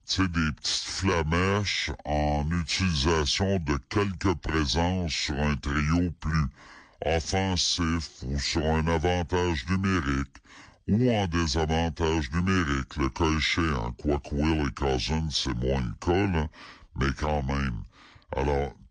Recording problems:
wrong speed and pitch; too slow and too low; 0.7 times normal speed

